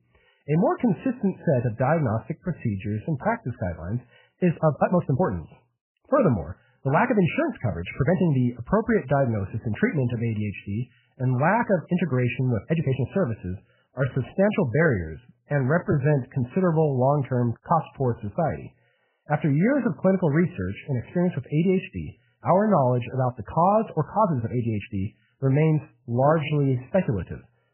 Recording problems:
garbled, watery; badly; nothing above 3 kHz
uneven, jittery; strongly; from 2.5 to 27 s

